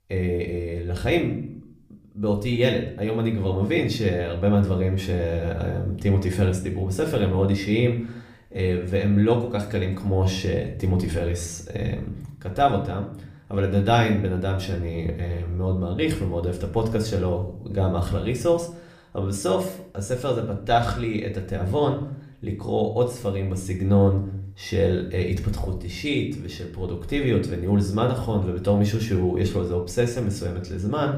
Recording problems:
room echo; slight; dies away in 0.5 s
off-mic speech; somewhat distant

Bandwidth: 15 kHz